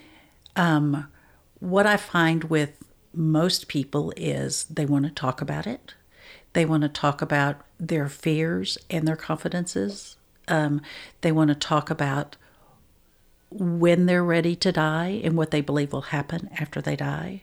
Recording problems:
none

